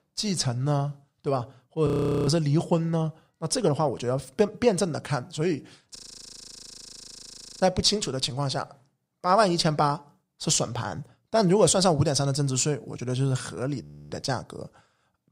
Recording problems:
audio freezing; at 2 s, at 6 s for 1.5 s and at 14 s

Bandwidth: 15.5 kHz